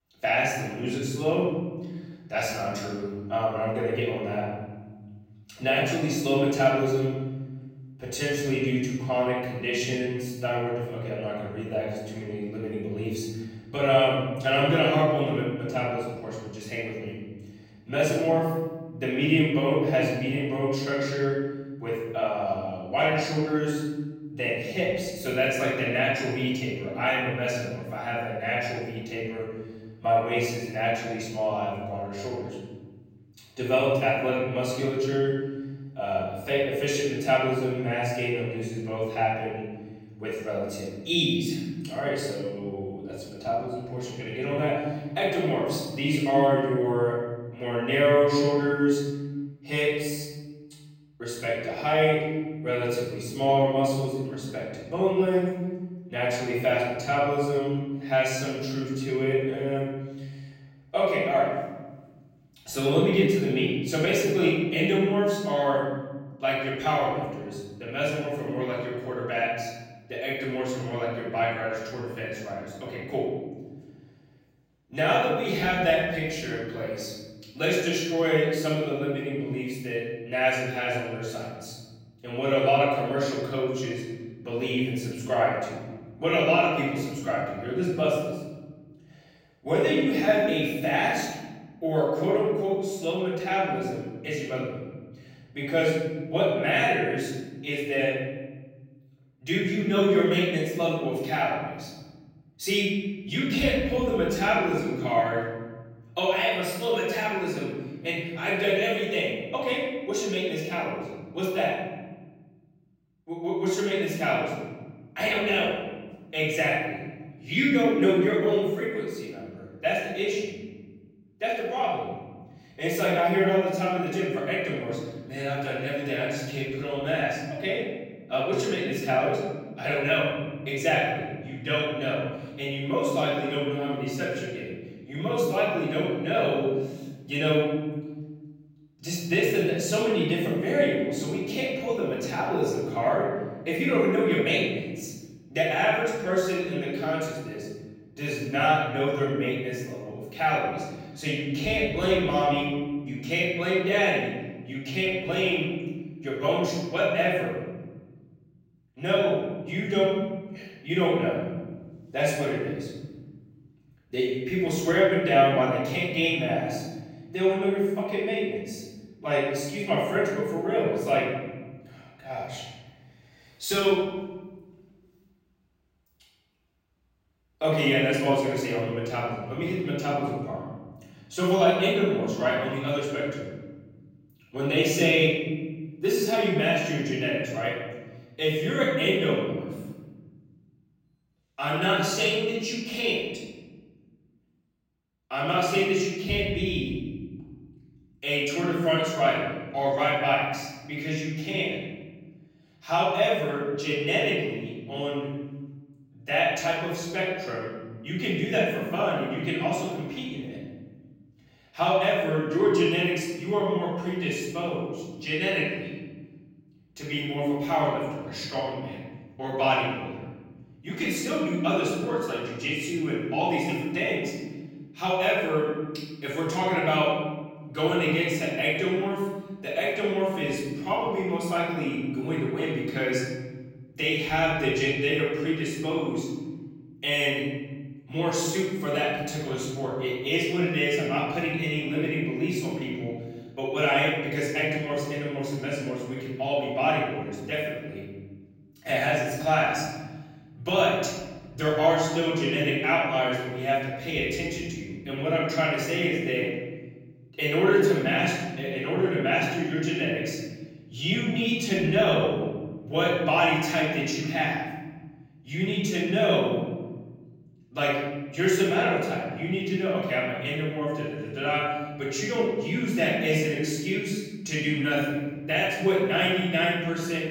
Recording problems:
off-mic speech; far
room echo; noticeable; dies away in 1.8 s

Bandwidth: 16 kHz